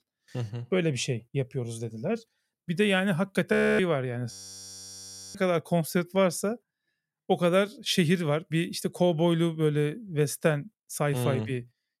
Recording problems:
audio freezing; at 3.5 s and at 4.5 s for 1 s

